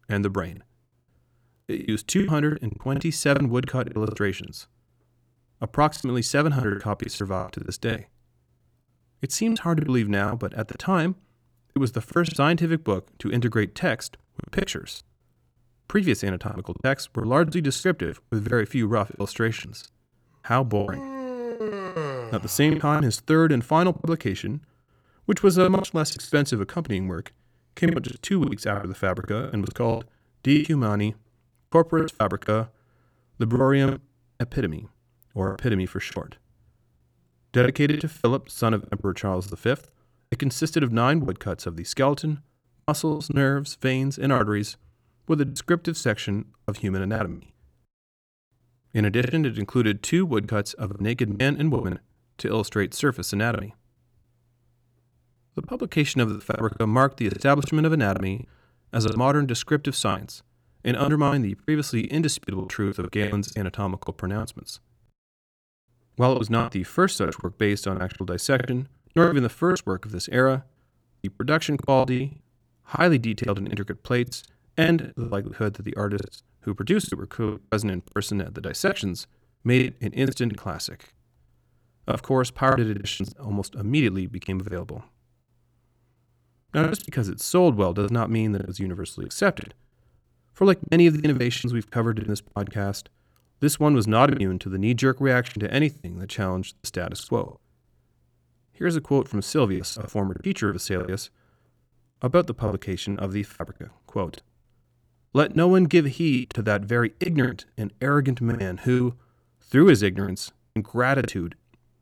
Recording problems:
choppy; very; 14% of the speech affected

